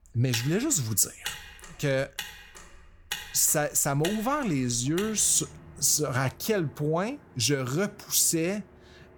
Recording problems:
traffic noise; noticeable; throughout; 15 dB below the speech

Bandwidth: 18.5 kHz